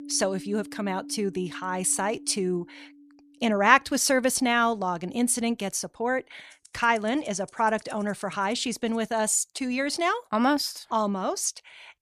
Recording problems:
background music; faint; until 9 s; 20 dB below the speech

